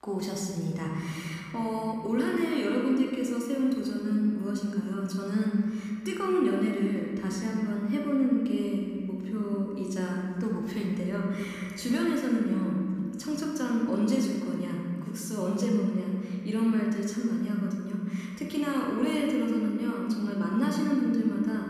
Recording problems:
room echo; noticeable; dies away in 2.2 s
off-mic speech; somewhat distant

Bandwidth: 15 kHz